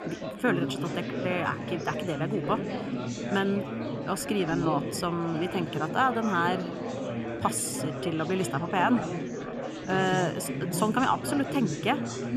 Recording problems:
chatter from many people; loud; throughout; 4 dB below the speech

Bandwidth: 13.5 kHz